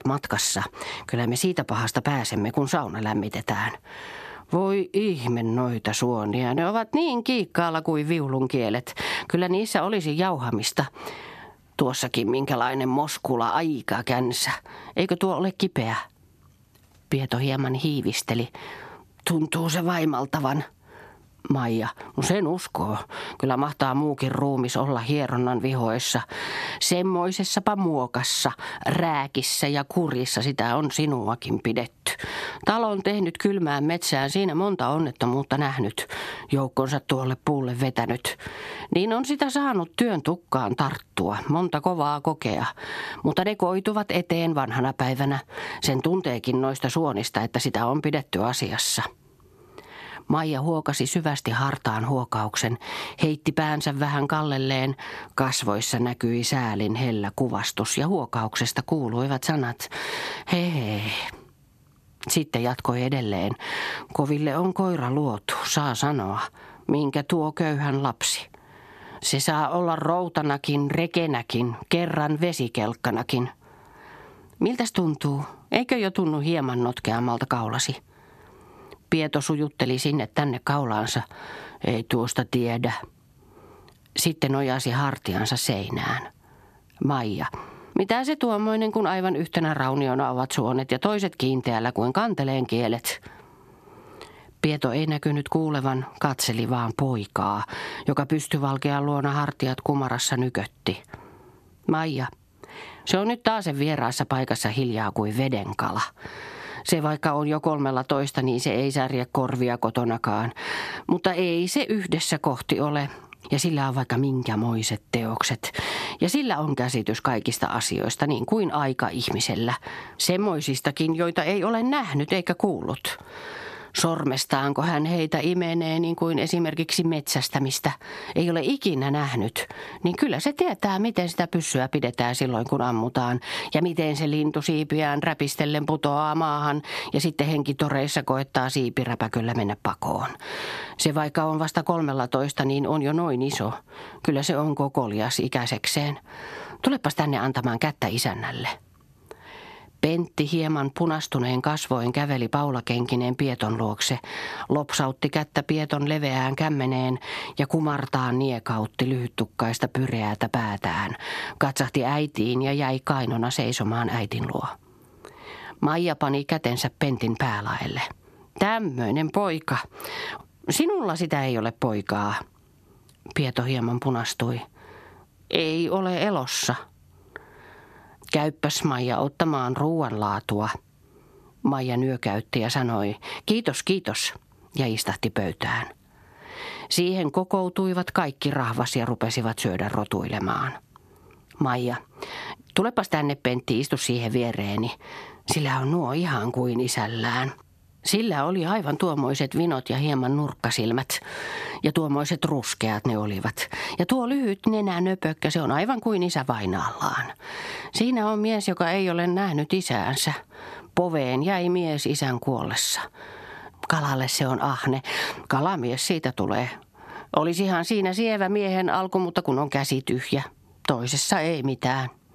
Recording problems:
squashed, flat; heavily

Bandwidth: 14 kHz